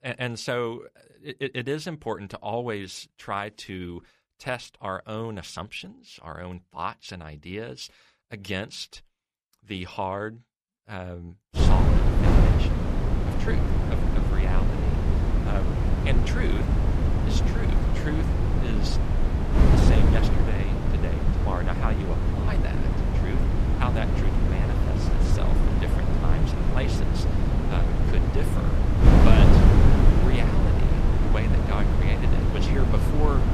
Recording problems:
wind noise on the microphone; heavy; from 12 s on; 2 dB above the speech

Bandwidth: 14.5 kHz